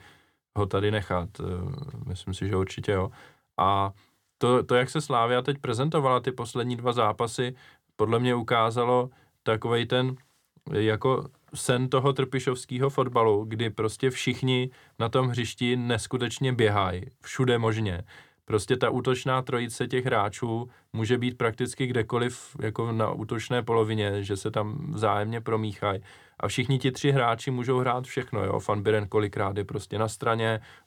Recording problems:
none

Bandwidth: 19 kHz